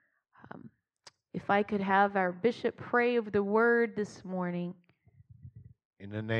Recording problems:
muffled; very; fading above 1.5 kHz
abrupt cut into speech; at the end

